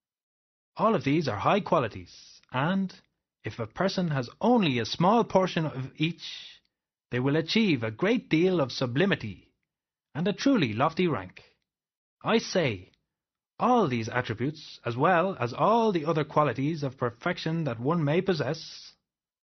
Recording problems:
garbled, watery; slightly; nothing above 6 kHz

